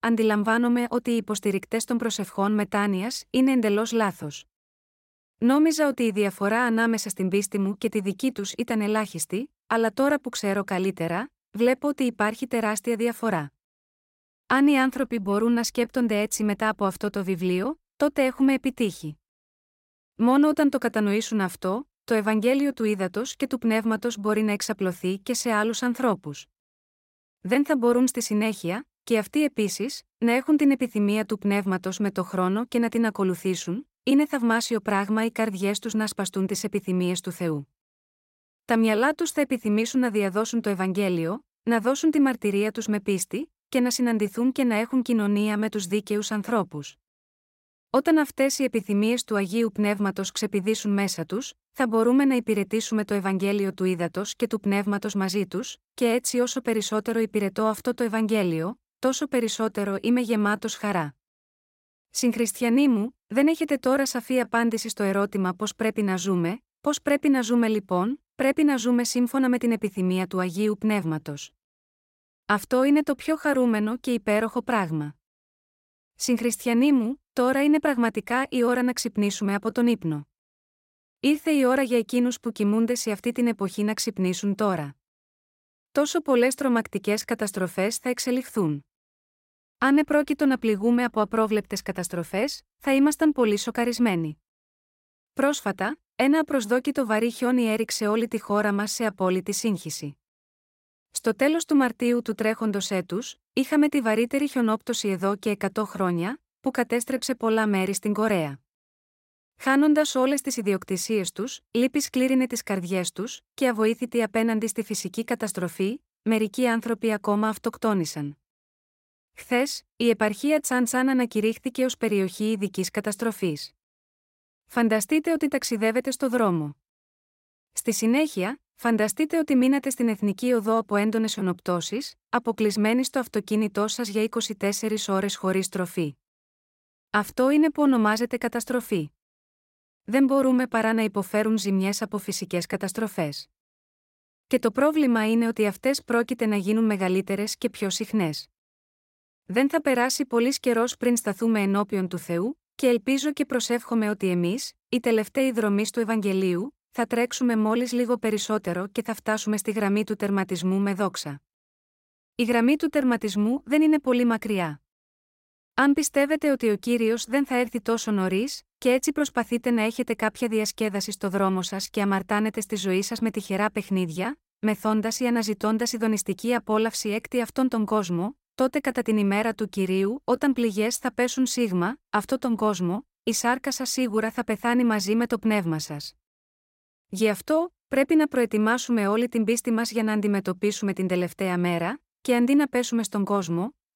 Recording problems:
none

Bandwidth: 16 kHz